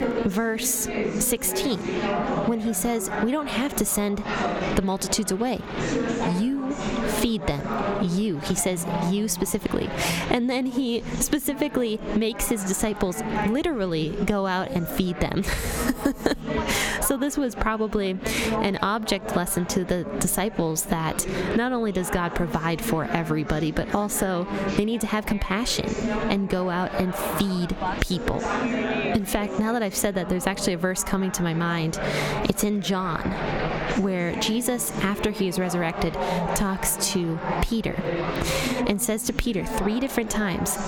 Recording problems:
squashed, flat; heavily, background pumping
chatter from many people; loud; throughout; 5 dB below the speech

